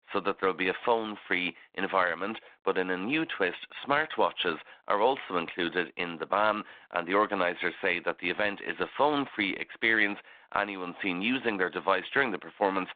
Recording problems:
phone-call audio; nothing above 3.5 kHz

